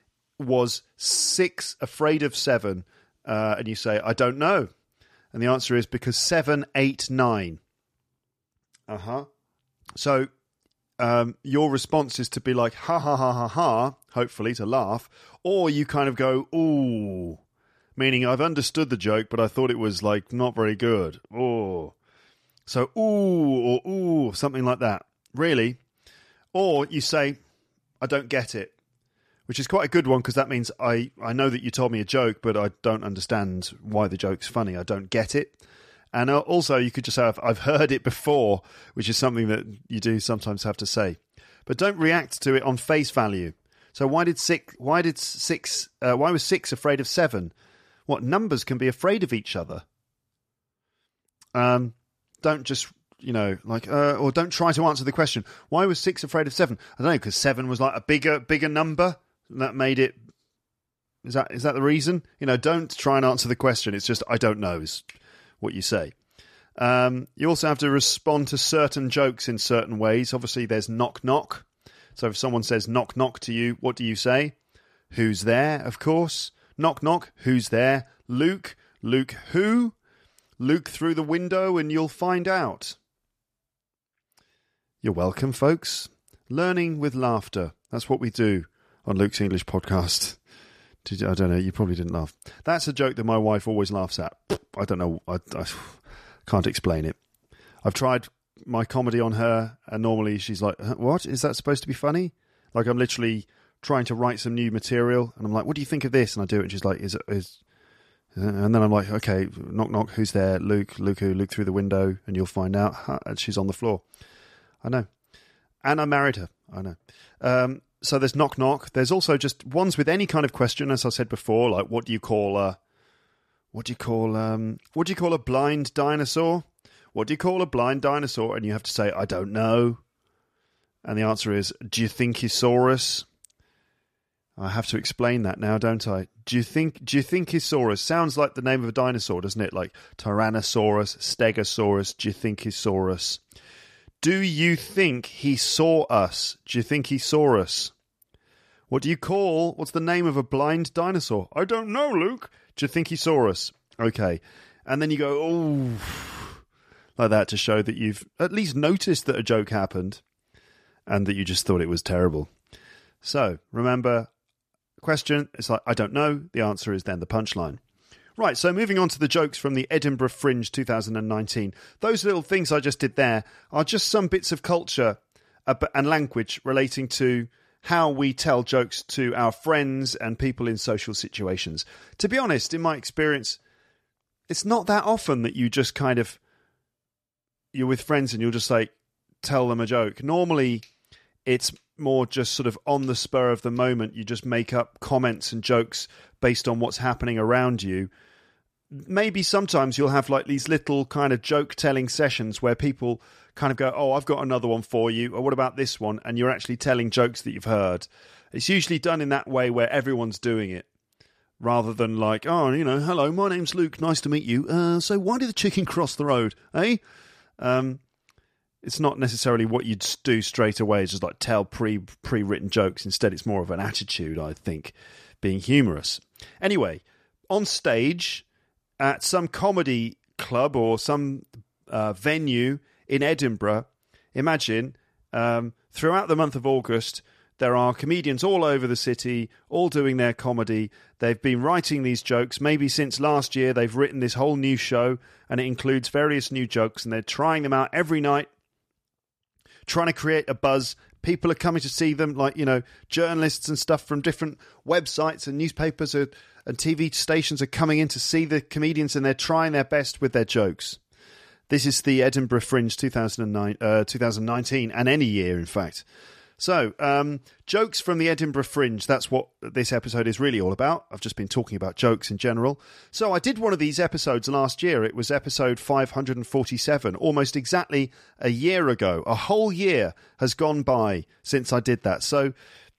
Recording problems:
none

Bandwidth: 14.5 kHz